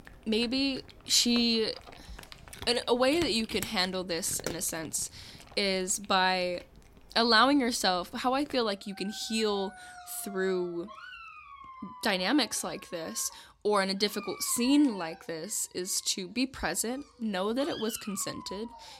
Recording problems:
animal sounds; noticeable; throughout; 20 dB below the speech

